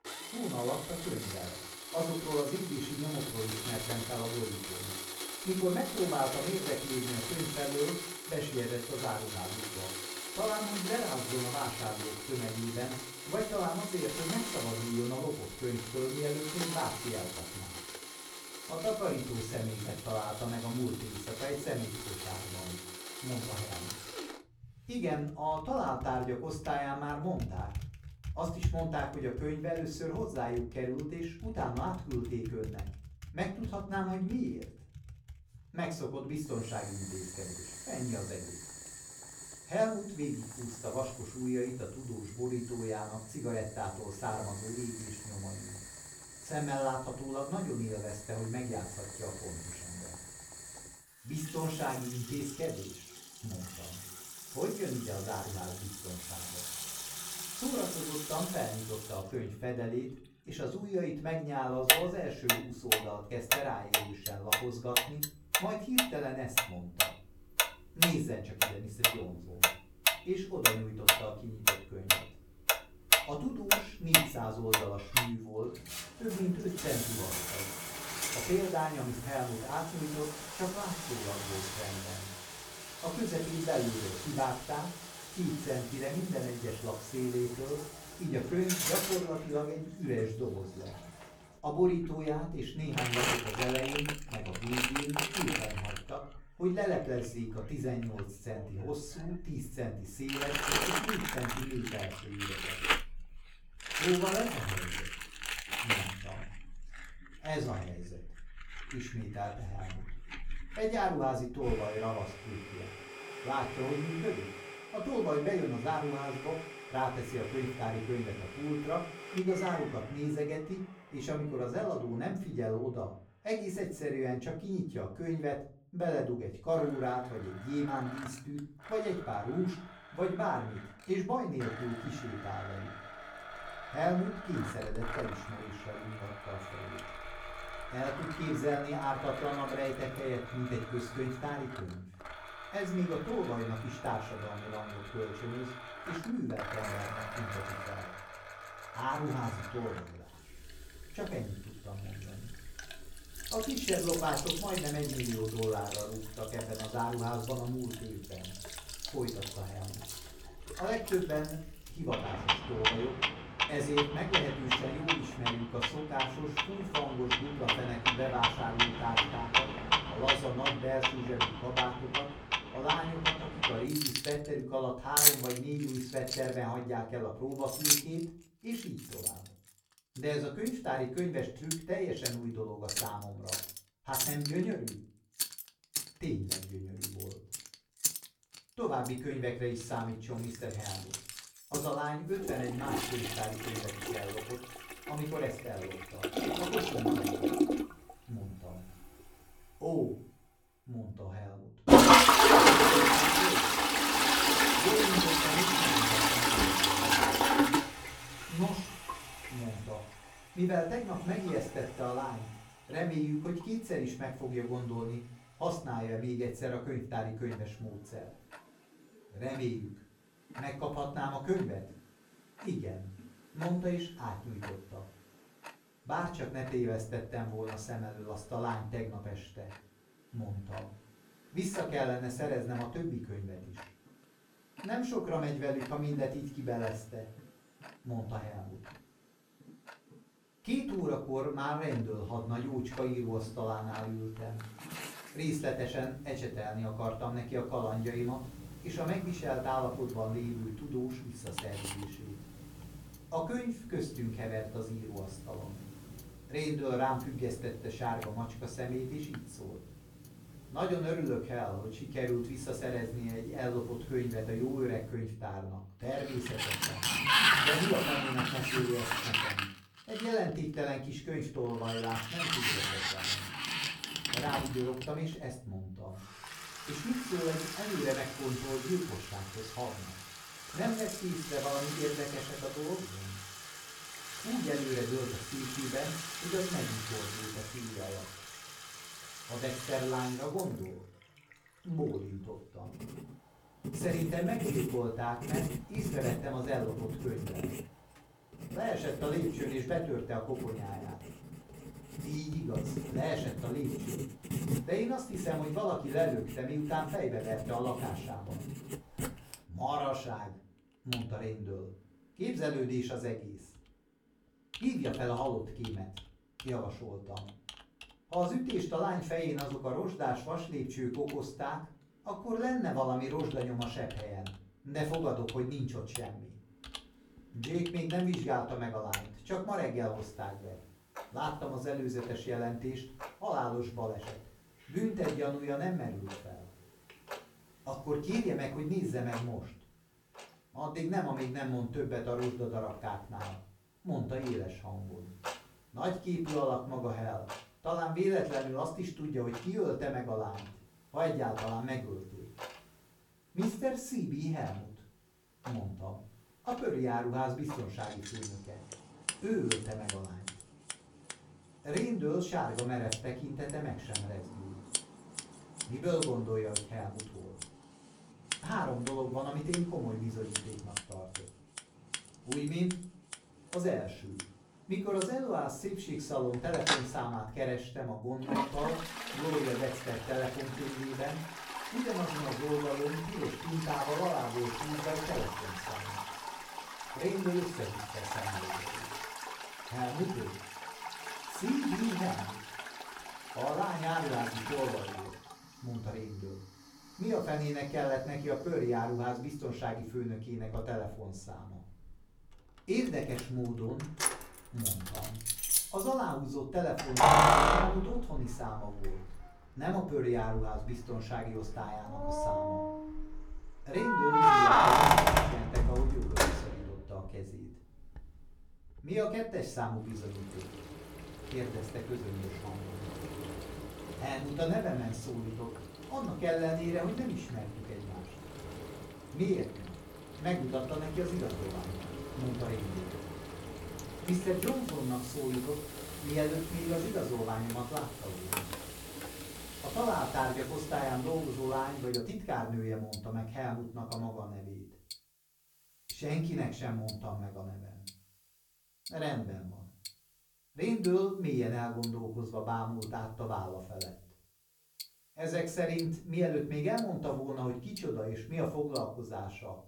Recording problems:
off-mic speech; far
room echo; slight; dies away in 0.3 s
household noises; very loud; throughout; 3 dB above the speech

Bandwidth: 17.5 kHz